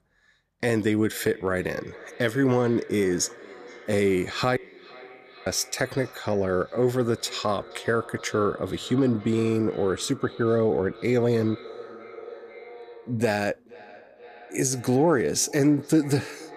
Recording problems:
echo of what is said; faint; throughout; 470 ms later, 20 dB below the speech
audio cutting out; at 4.5 s for 1 s

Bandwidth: 14.5 kHz